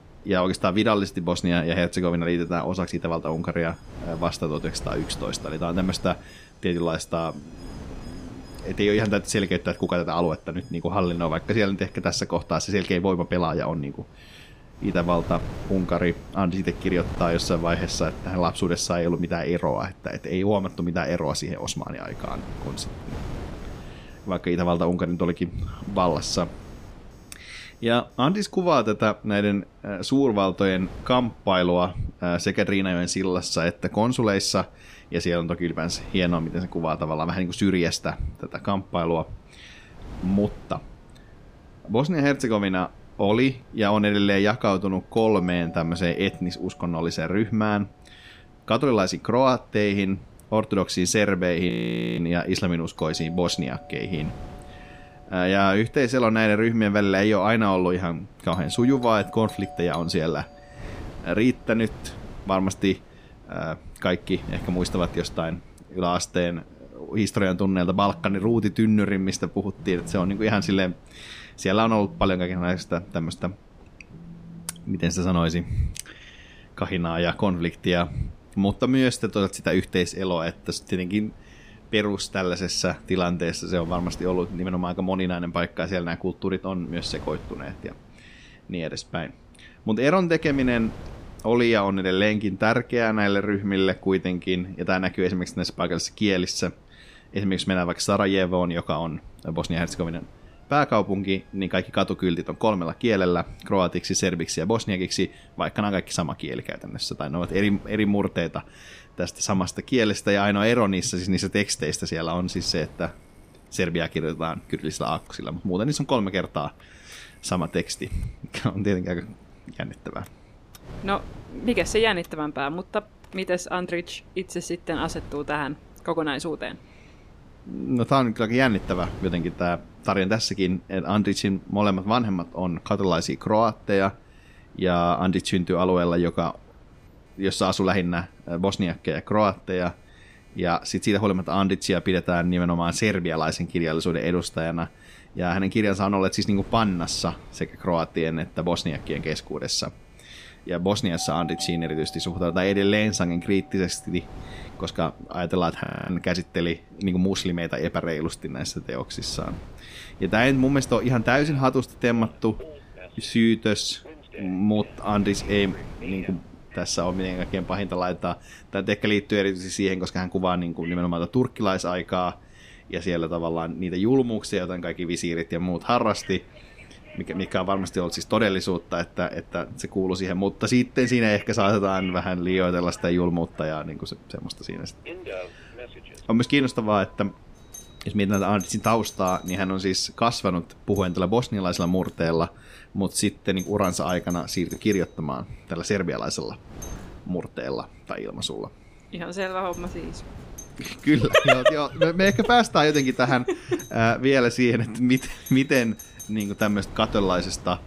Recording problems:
wind noise on the microphone; occasional gusts; 25 dB below the speech
alarms or sirens; faint; throughout; 20 dB below the speech
audio freezing; at 52 s and at 2:36

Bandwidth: 15 kHz